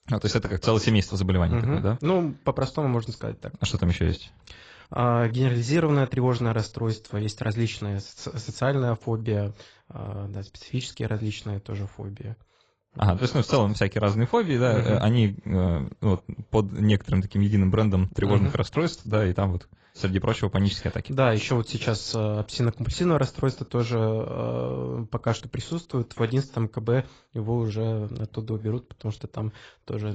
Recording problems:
garbled, watery; badly; nothing above 7.5 kHz
abrupt cut into speech; at the end

